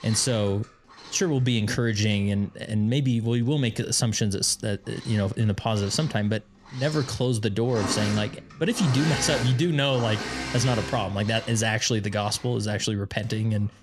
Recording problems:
machinery noise; loud; throughout; 9 dB below the speech

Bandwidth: 14.5 kHz